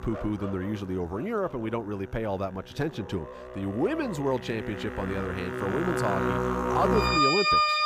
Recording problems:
background music; very loud; throughout; 3 dB above the speech

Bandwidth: 15 kHz